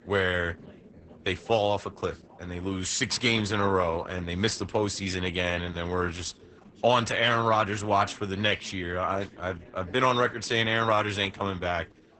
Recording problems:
garbled, watery; badly; nothing above 8 kHz
background chatter; faint; throughout; 4 voices, 25 dB below the speech

